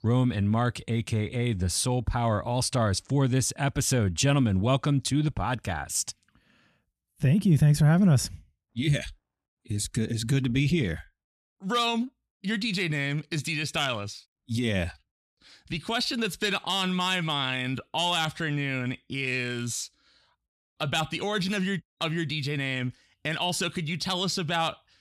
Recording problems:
none

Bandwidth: 13.5 kHz